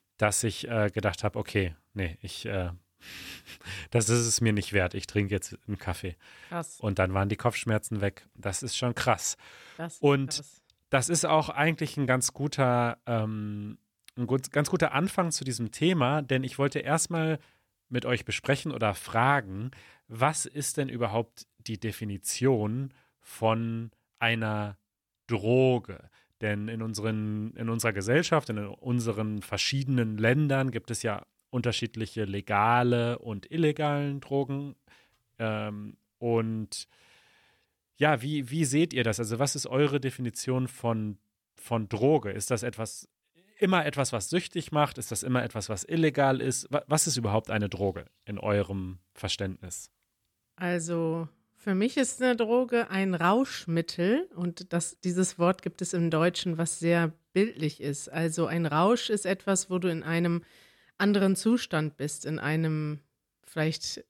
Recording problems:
none

